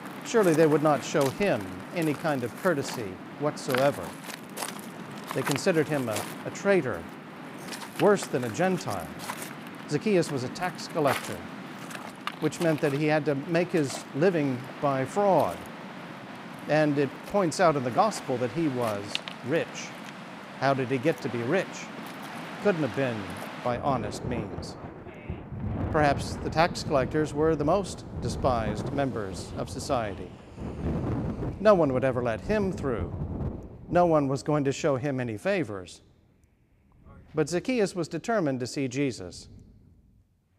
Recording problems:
rain or running water; loud; throughout; 10 dB below the speech

